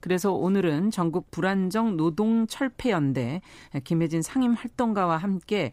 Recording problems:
none

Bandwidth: 15.5 kHz